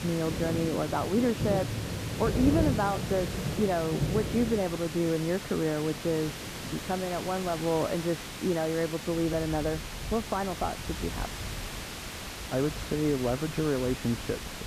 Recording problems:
muffled; very; fading above 2.5 kHz
rain or running water; loud; throughout; 7 dB below the speech
hiss; loud; throughout; 8 dB below the speech

